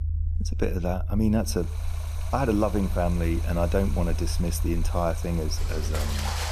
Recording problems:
rain or running water; noticeable; from 1.5 s on; 10 dB below the speech
low rumble; noticeable; throughout; 20 dB below the speech

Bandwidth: 14 kHz